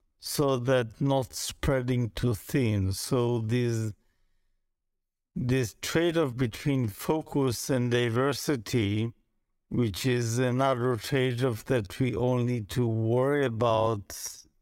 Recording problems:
wrong speed, natural pitch; too slow; 0.6 times normal speed

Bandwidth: 16 kHz